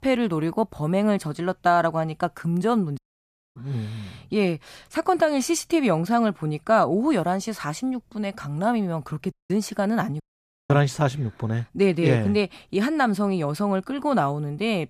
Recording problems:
audio cutting out; at 3 s for 0.5 s, at 9.5 s and at 10 s for 0.5 s

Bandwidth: 14.5 kHz